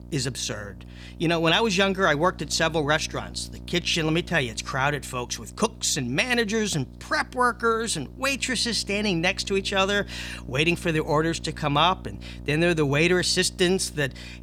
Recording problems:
electrical hum; faint; throughout; 60 Hz, 25 dB below the speech

